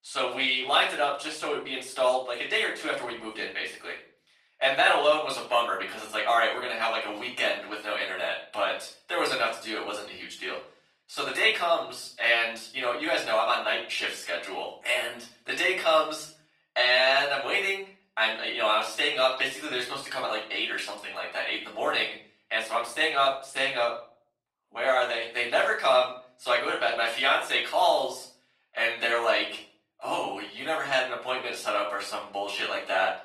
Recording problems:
off-mic speech; far
thin; very; fading below 850 Hz
room echo; slight; dies away in 0.4 s
garbled, watery; slightly; nothing above 15.5 kHz

